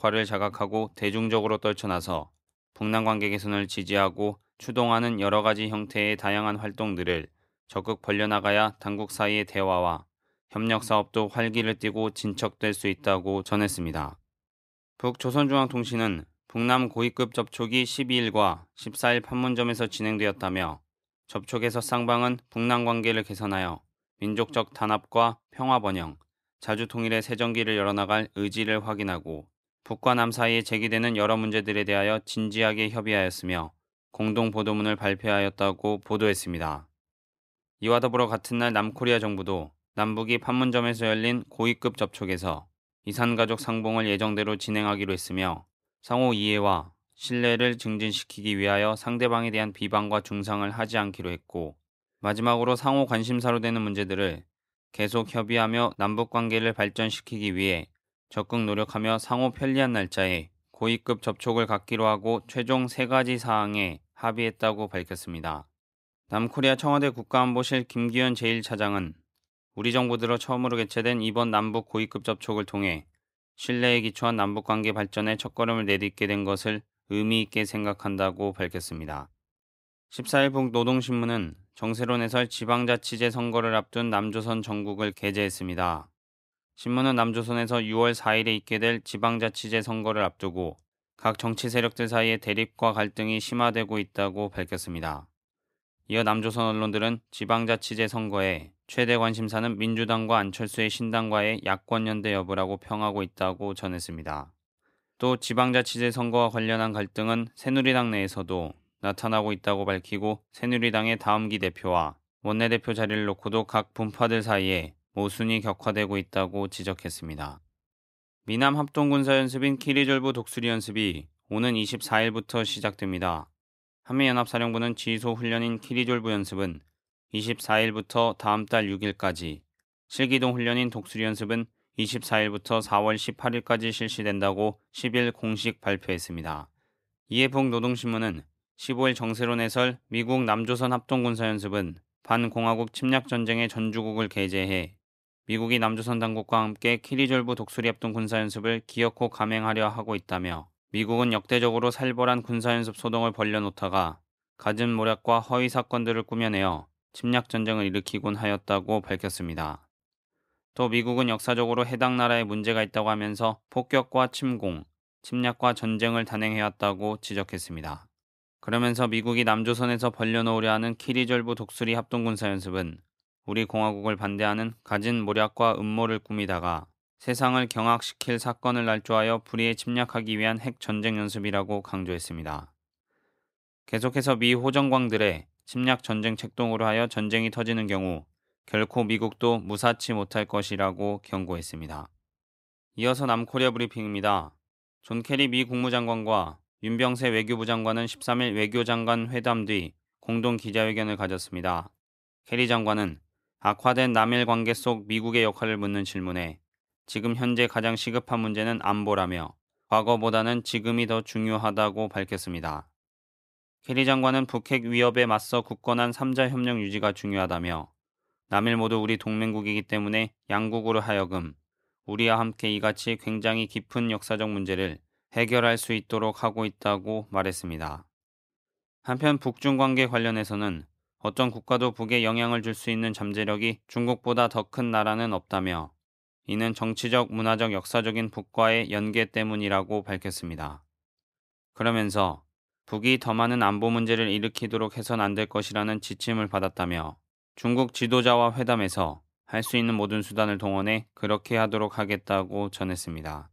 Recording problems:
none

